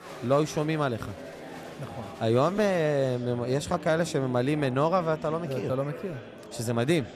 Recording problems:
murmuring crowd; noticeable; throughout; 15 dB below the speech

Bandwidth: 14.5 kHz